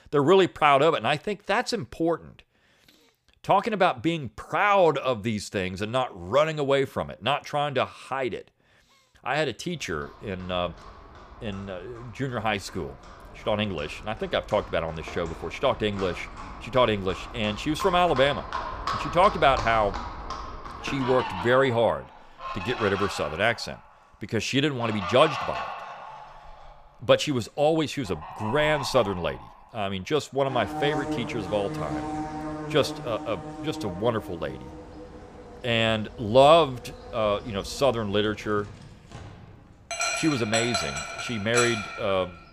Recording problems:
animal sounds; loud; from 10 s on; 9 dB below the speech

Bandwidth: 15 kHz